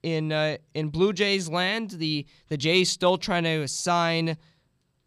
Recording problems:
none

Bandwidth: 15 kHz